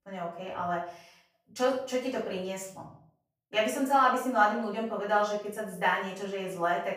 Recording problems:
off-mic speech; far
room echo; noticeable; dies away in 0.5 s

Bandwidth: 15 kHz